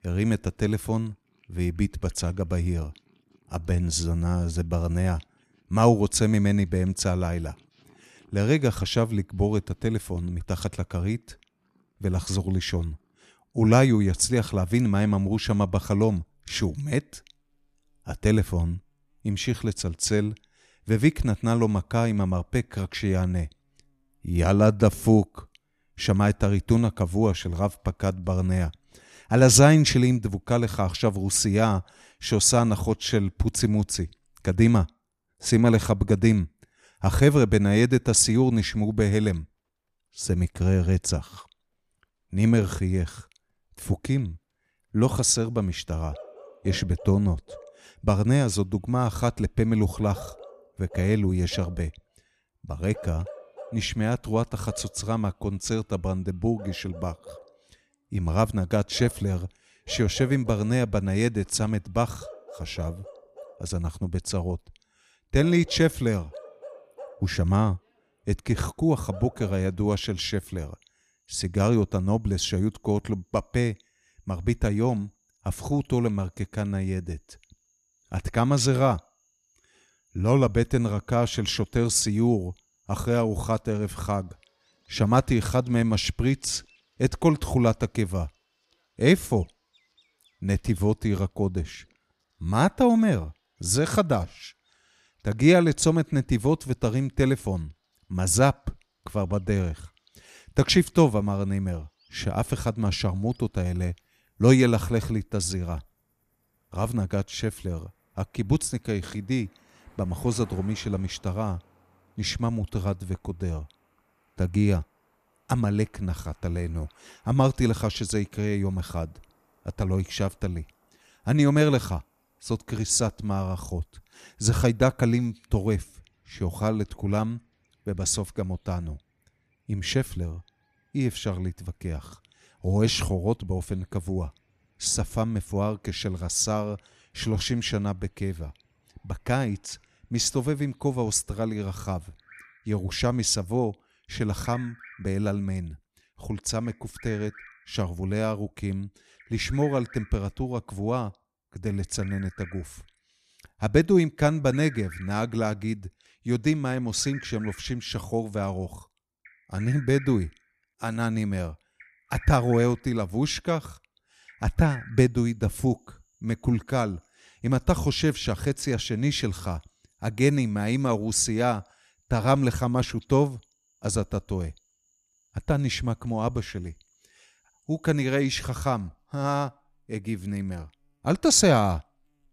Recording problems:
animal sounds; faint; throughout; 25 dB below the speech

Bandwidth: 14.5 kHz